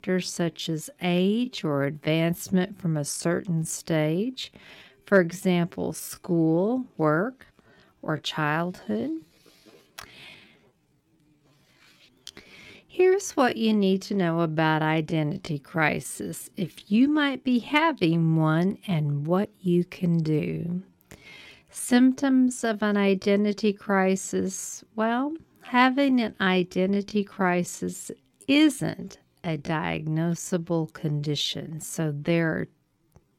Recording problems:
wrong speed, natural pitch; too slow; 0.6 times normal speed

